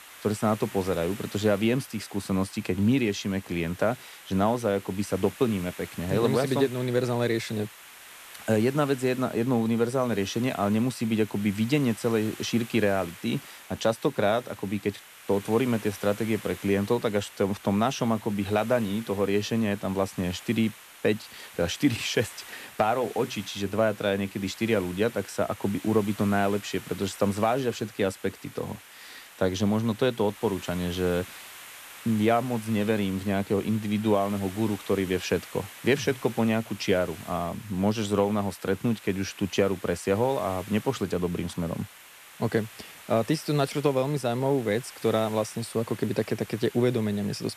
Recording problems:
hiss; noticeable; throughout; 15 dB below the speech

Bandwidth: 14.5 kHz